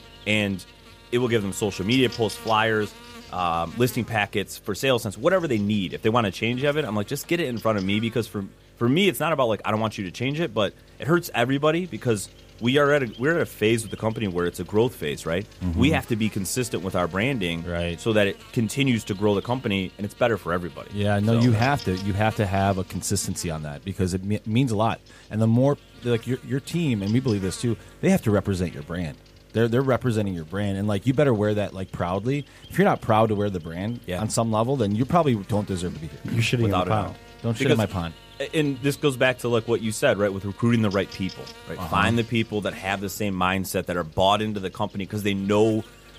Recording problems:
electrical hum; faint; throughout; 50 Hz, 20 dB below the speech

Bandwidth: 15 kHz